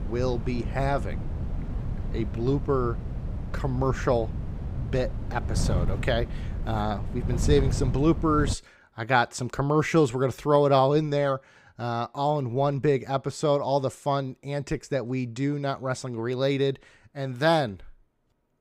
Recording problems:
wind noise on the microphone; occasional gusts; until 8.5 s; 15 dB below the speech

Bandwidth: 15.5 kHz